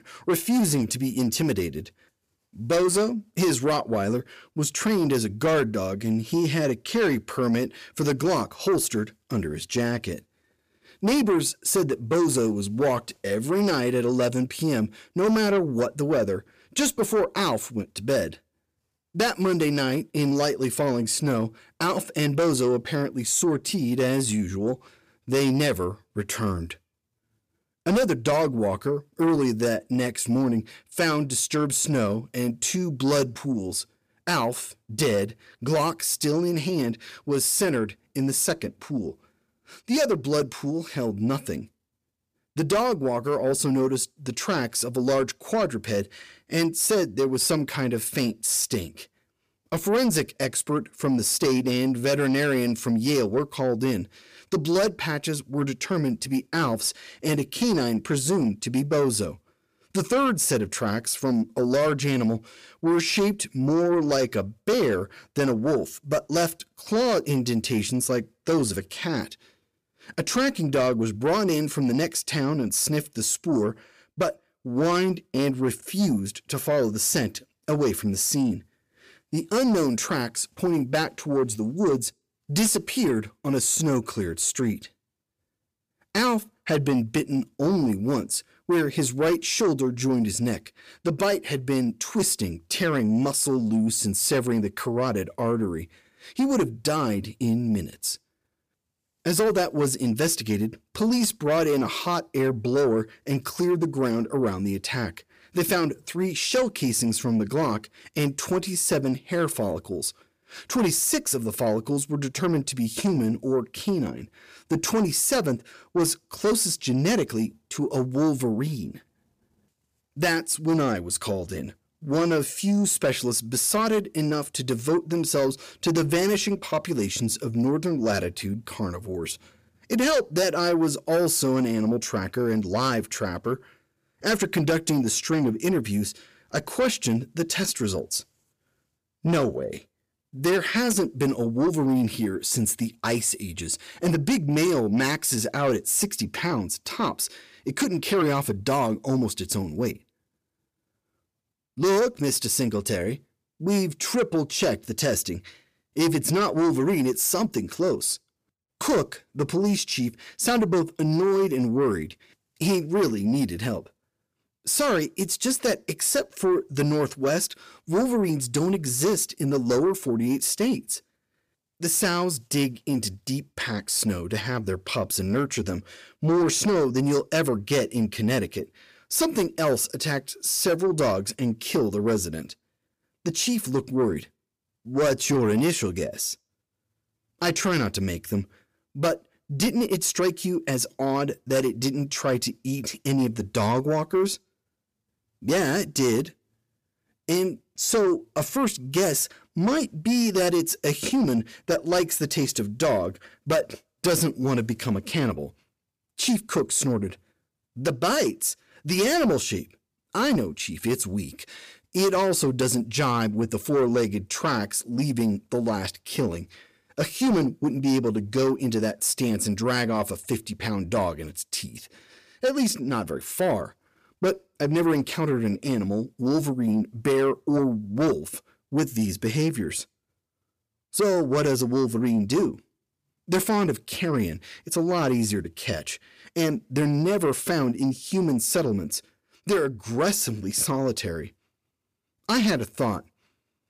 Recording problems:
distortion; slight; 10 dB below the speech

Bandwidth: 15 kHz